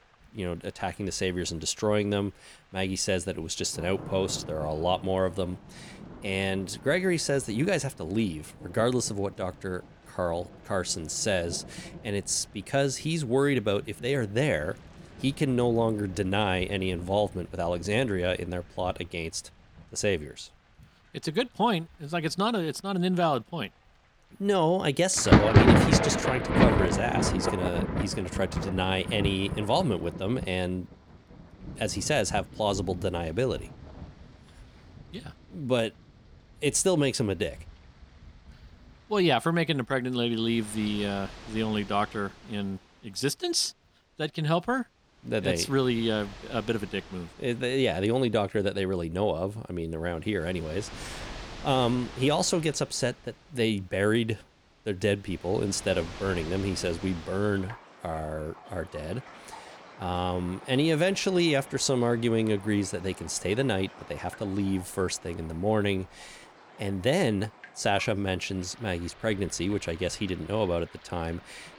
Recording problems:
rain or running water; loud; throughout; 2 dB below the speech

